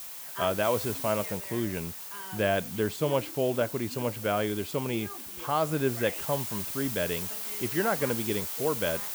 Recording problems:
hiss; loud; throughout; 5 dB below the speech
voice in the background; noticeable; throughout; 15 dB below the speech

